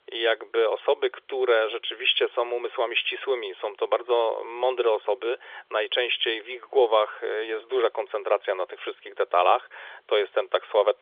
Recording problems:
phone-call audio; nothing above 3.5 kHz

